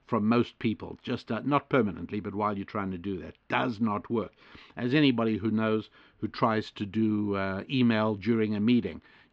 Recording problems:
muffled; very slightly; fading above 4 kHz

